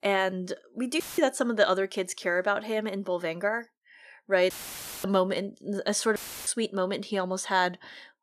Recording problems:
audio cutting out; filled with static; at 1 s, at 4.5 s for 0.5 s and at 6 s

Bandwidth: 14.5 kHz